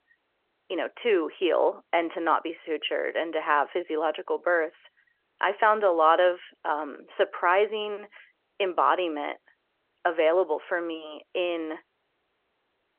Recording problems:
phone-call audio

